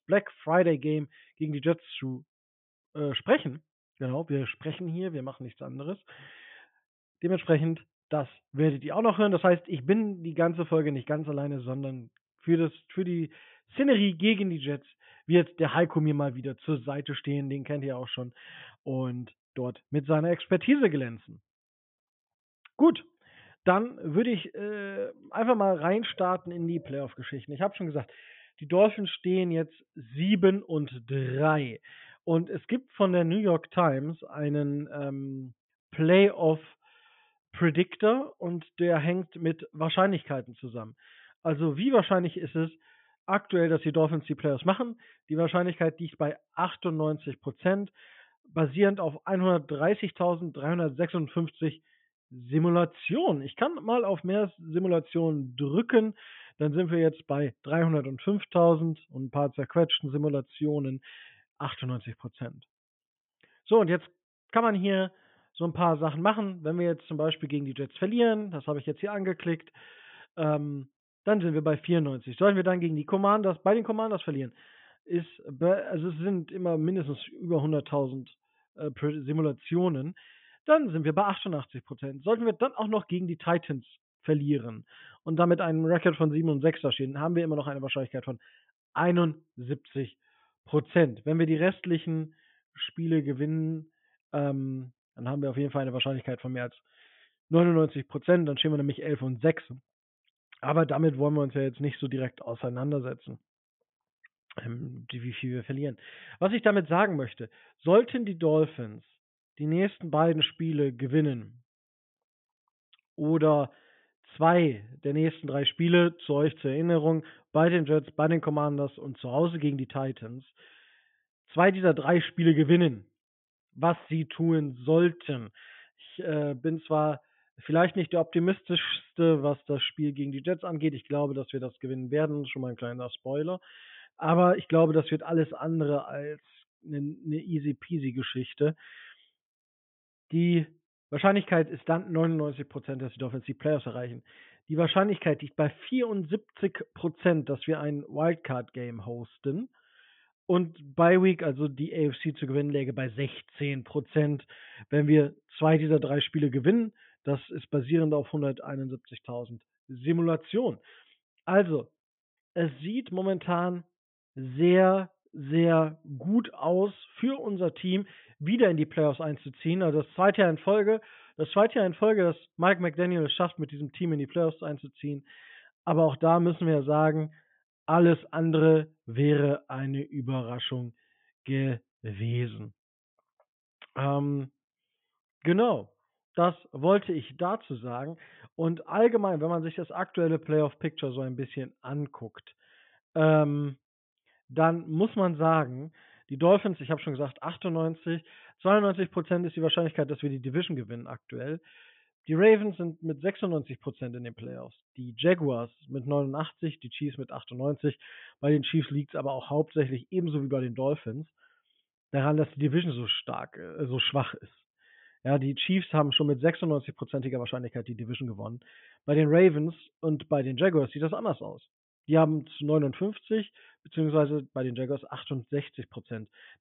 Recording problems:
high frequencies cut off; severe; nothing above 3.5 kHz

